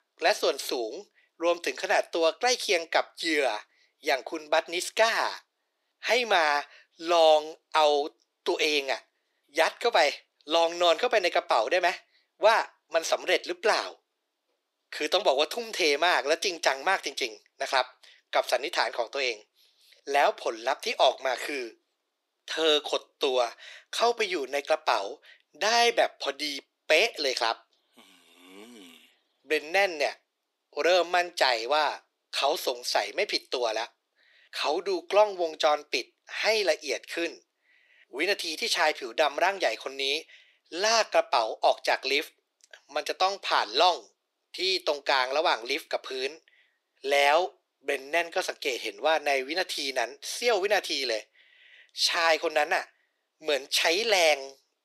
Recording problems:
thin; very; fading below 350 Hz

